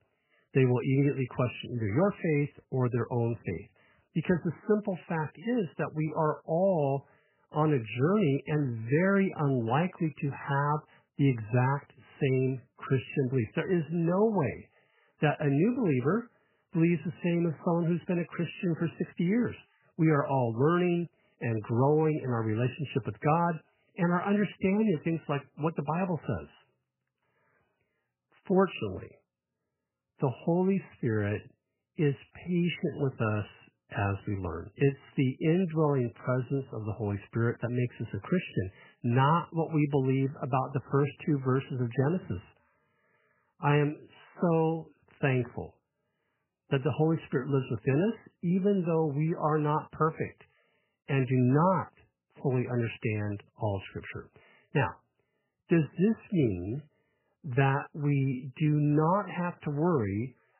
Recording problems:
garbled, watery; badly; nothing above 3 kHz

